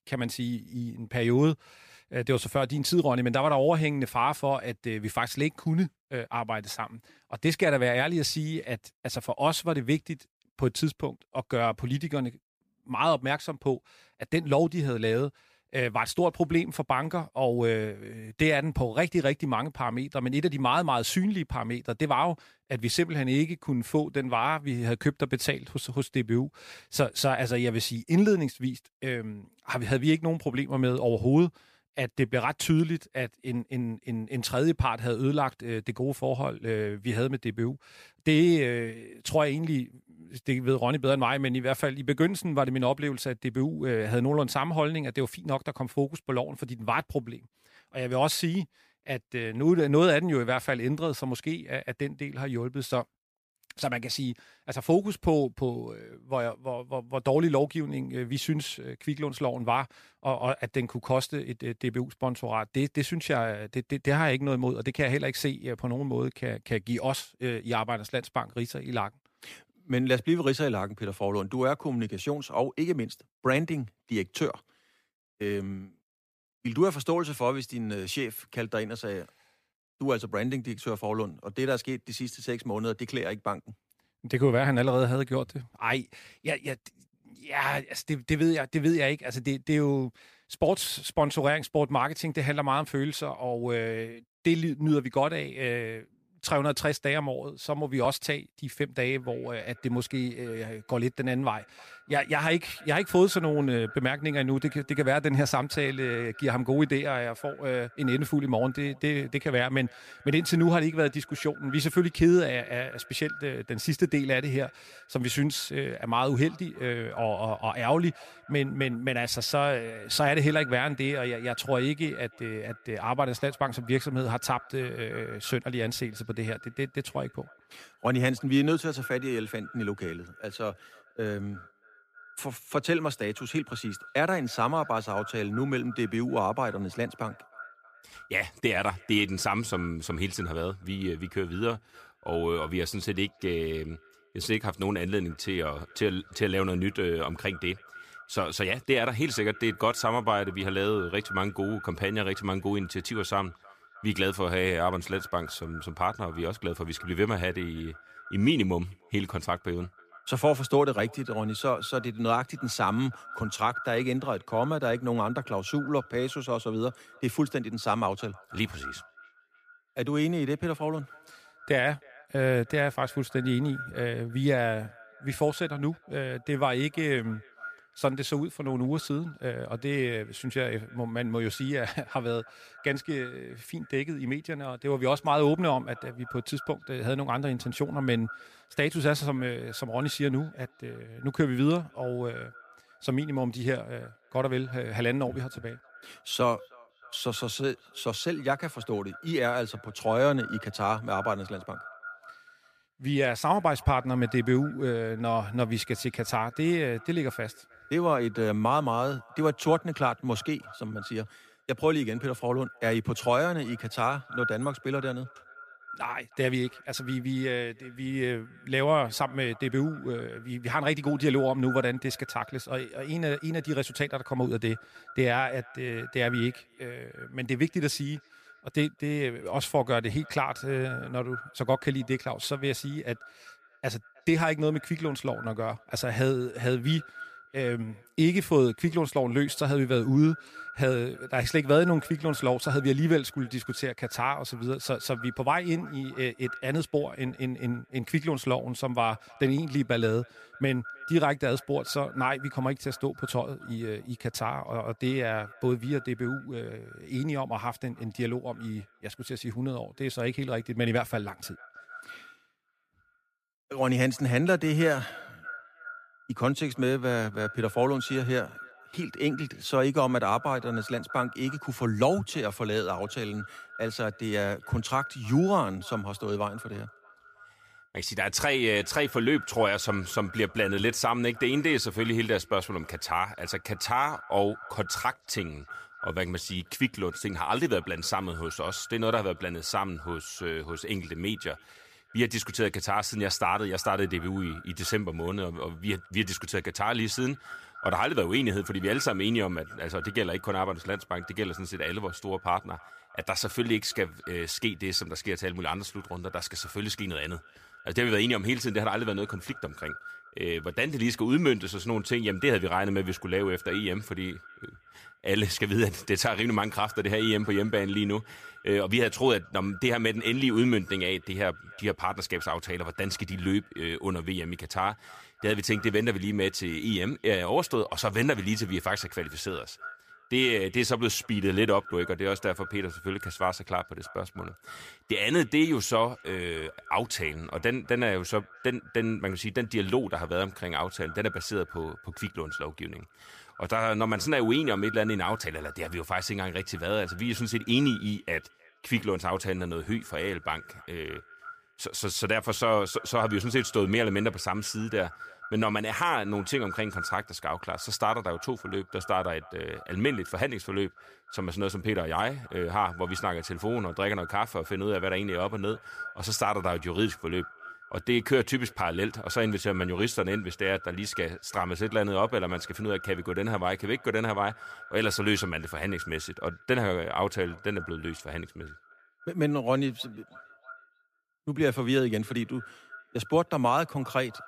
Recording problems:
echo of what is said; noticeable; from 1:39 on; 320 ms later, 15 dB below the speech

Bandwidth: 15 kHz